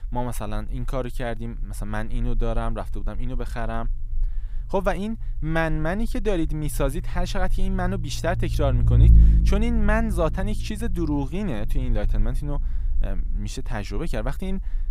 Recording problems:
low rumble; noticeable; throughout; 10 dB below the speech

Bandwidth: 15.5 kHz